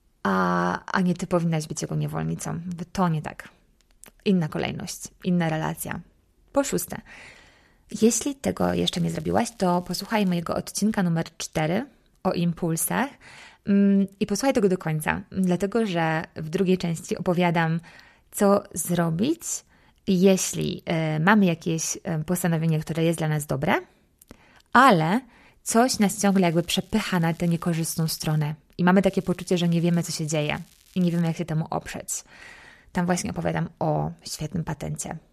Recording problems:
crackling; faint; from 8.5 to 10 s, from 26 to 28 s and from 29 to 31 s; 30 dB below the speech

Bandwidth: 14 kHz